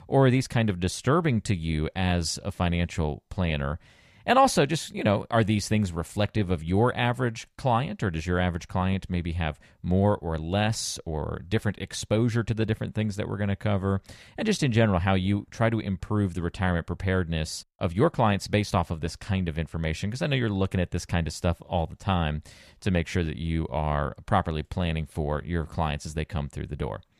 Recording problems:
none

